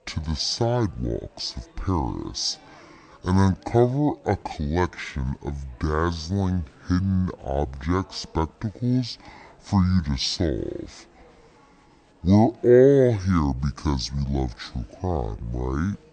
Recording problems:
wrong speed and pitch; too slow and too low; 0.6 times normal speed
chatter from many people; faint; throughout; 30 dB below the speech

